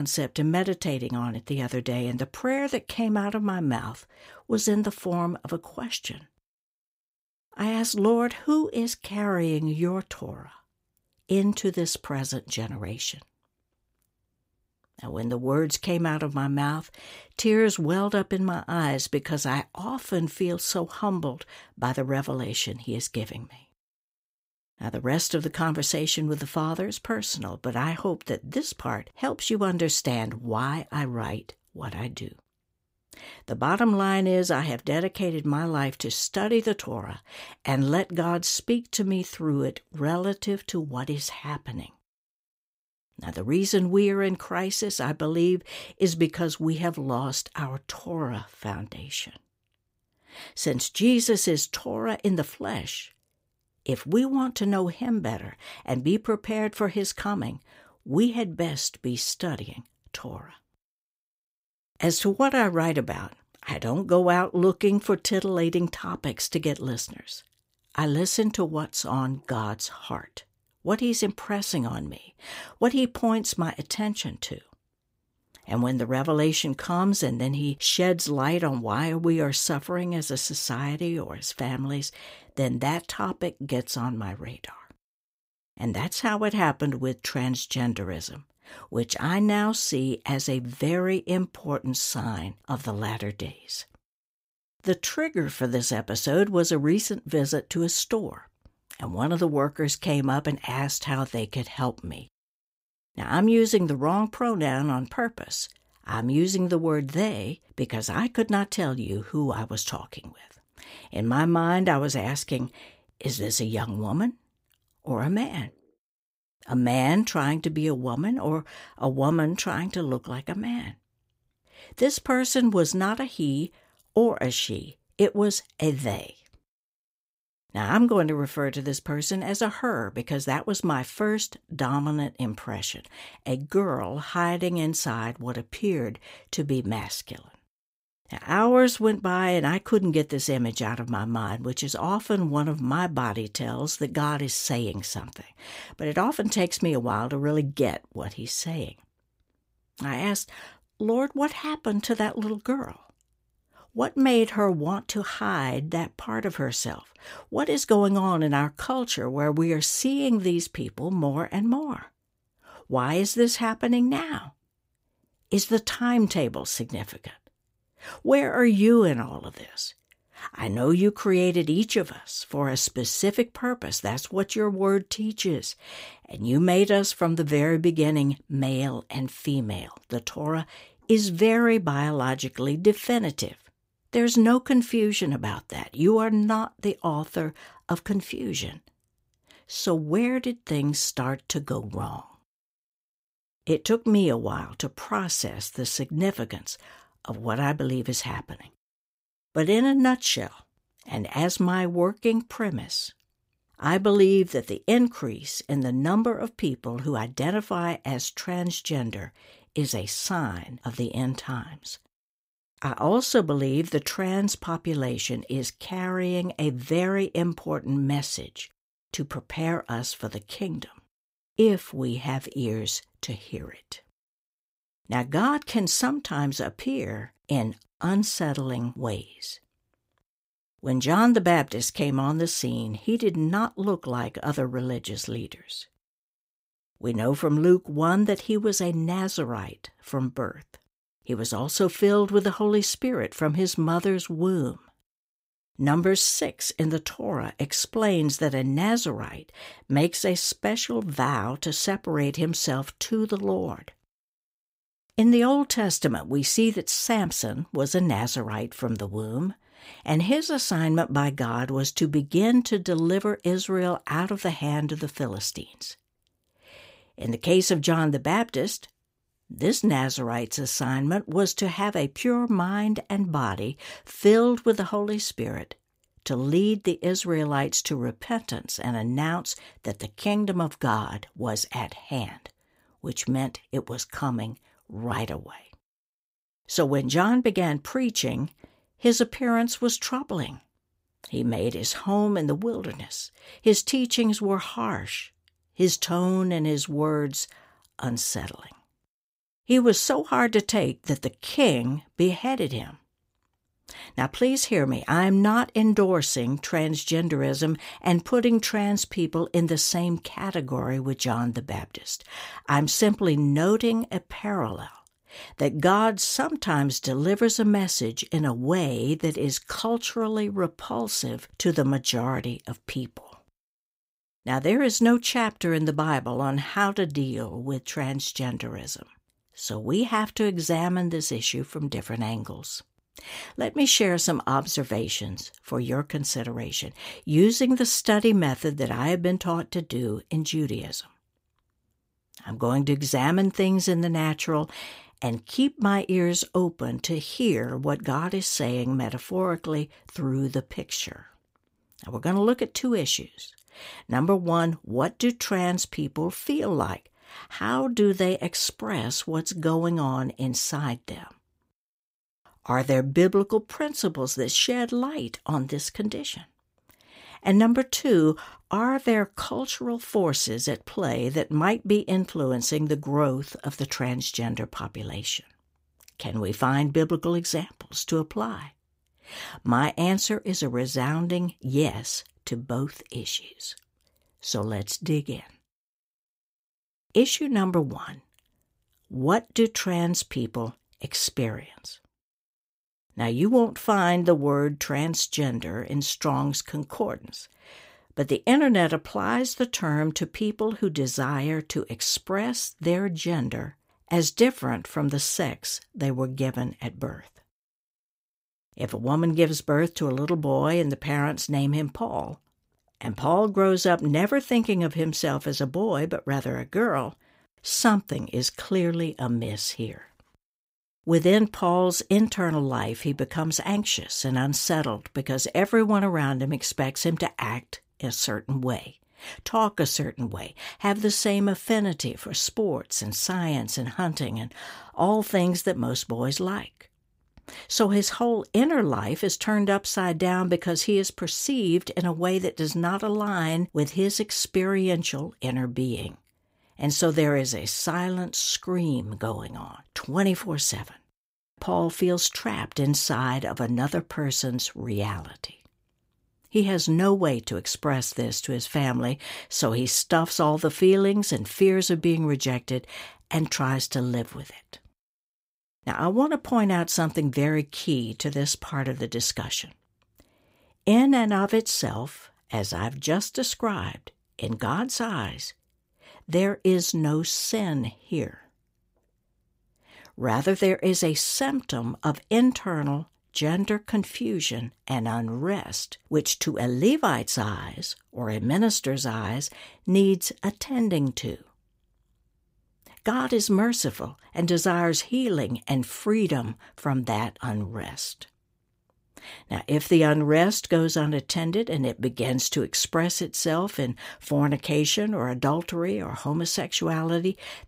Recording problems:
abrupt cut into speech; at the start

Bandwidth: 15.5 kHz